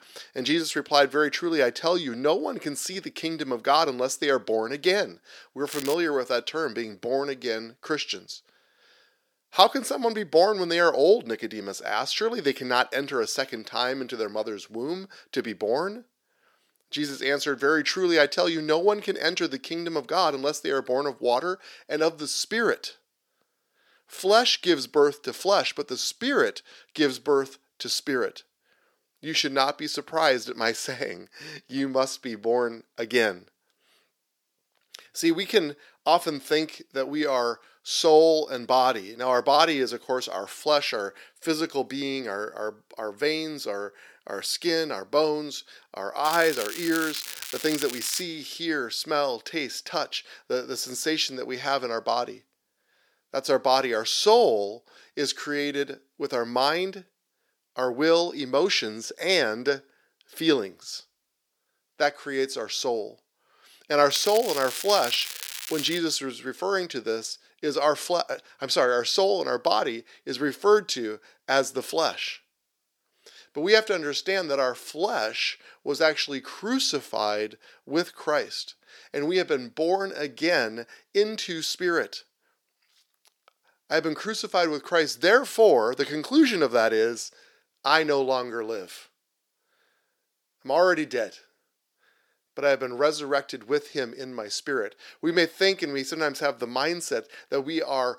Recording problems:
thin; somewhat; fading below 400 Hz
crackling; loud; at 5.5 s, from 46 to 48 s and from 1:04 to 1:06; 9 dB below the speech

